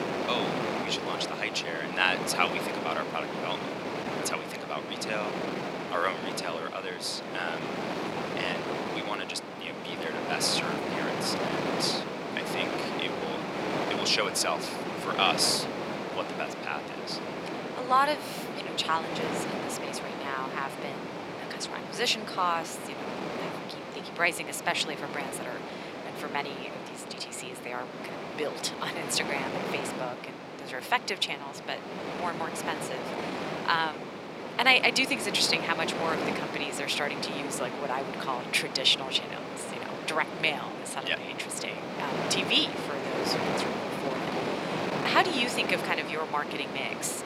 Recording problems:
thin; very; fading below 600 Hz
wind noise on the microphone; heavy; 5 dB below the speech

